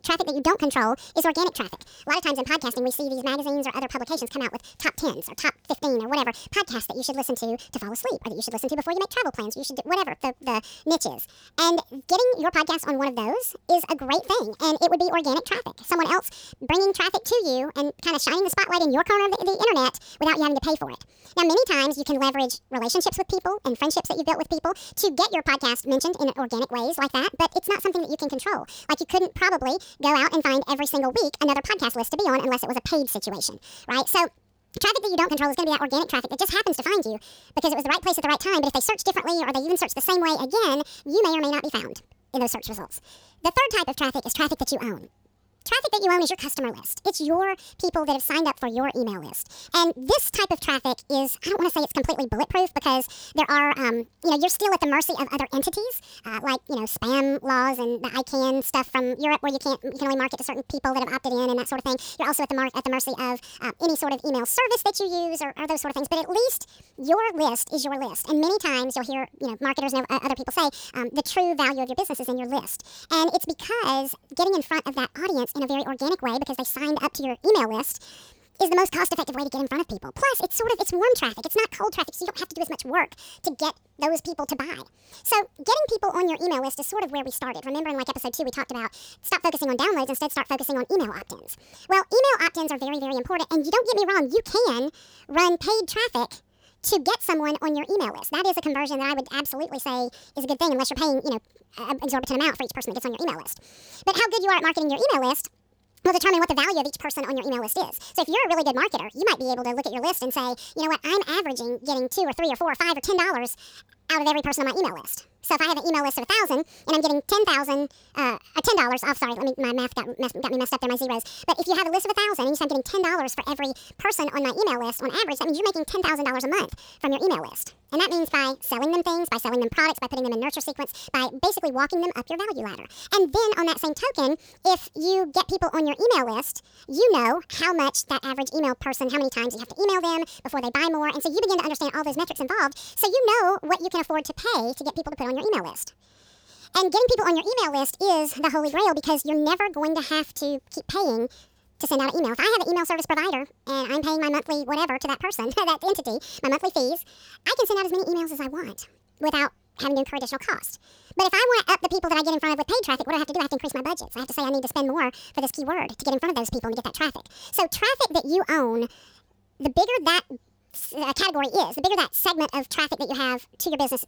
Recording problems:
wrong speed and pitch; too fast and too high; 1.6 times normal speed

